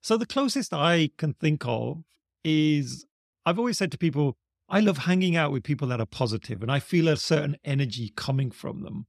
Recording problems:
none

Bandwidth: 14 kHz